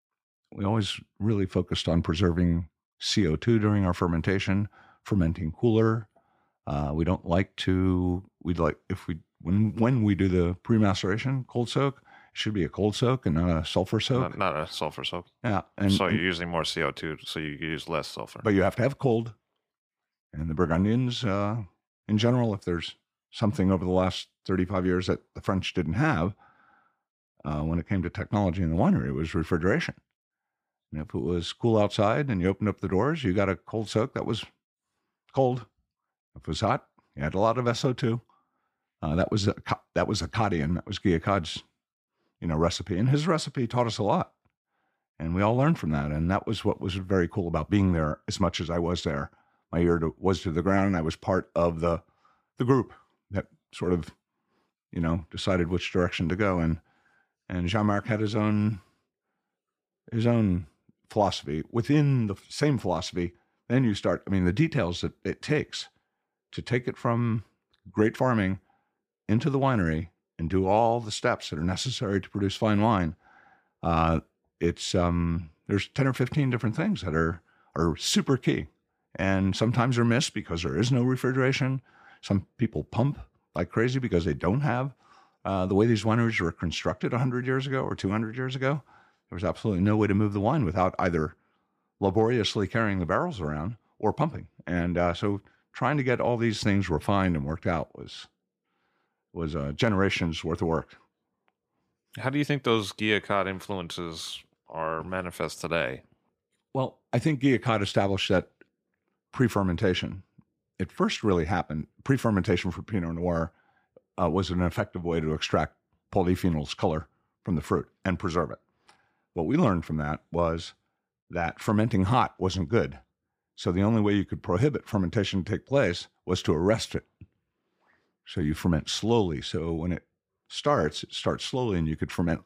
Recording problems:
none

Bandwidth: 15 kHz